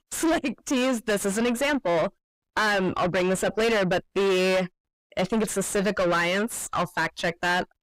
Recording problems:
distortion; heavy; 5 dB below the speech

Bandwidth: 15.5 kHz